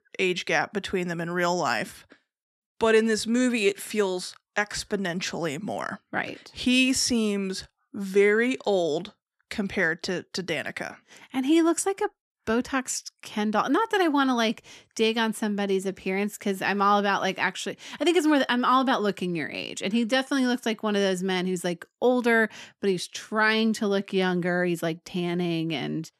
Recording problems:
none

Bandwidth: 13.5 kHz